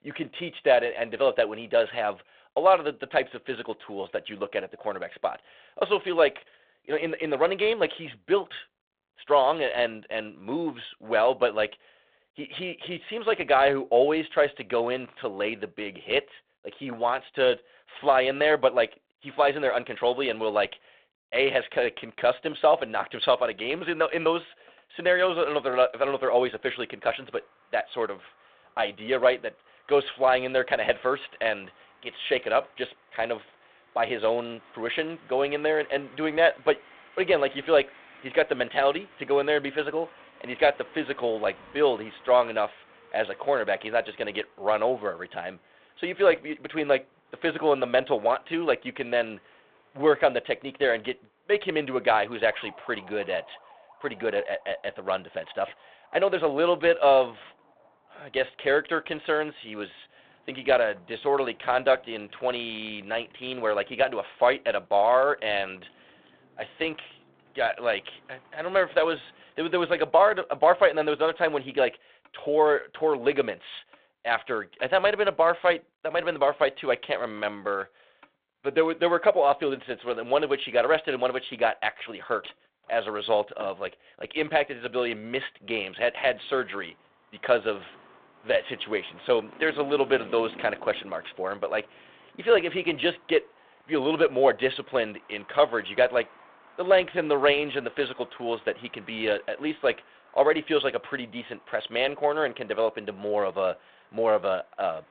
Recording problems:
phone-call audio; nothing above 3.5 kHz
traffic noise; faint; throughout; 30 dB below the speech

